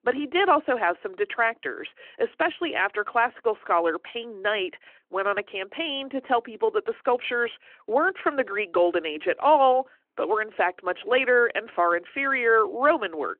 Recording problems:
phone-call audio

